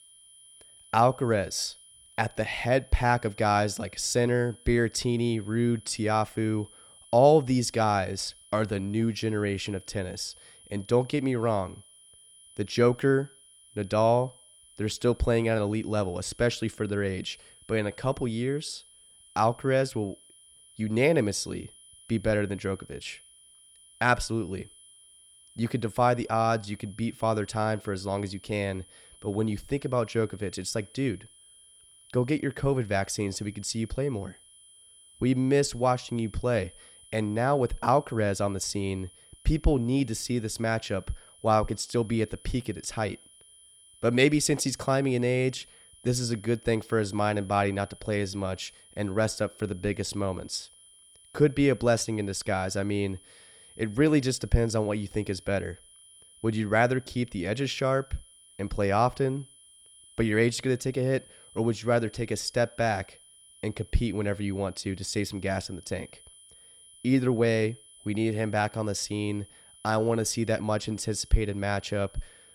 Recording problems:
high-pitched whine; faint; throughout; 10 kHz, 25 dB below the speech

